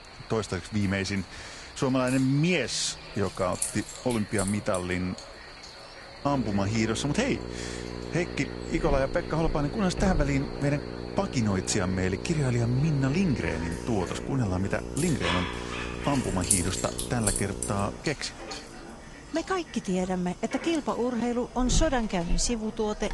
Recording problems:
echo of what is said; faint; throughout; 530 ms later, 20 dB below the speech
garbled, watery; slightly
household noises; loud; throughout; 7 dB below the speech
electrical hum; noticeable; from 6.5 to 18 s; 60 Hz, 10 dB below the speech
animal sounds; noticeable; throughout; 15 dB below the speech

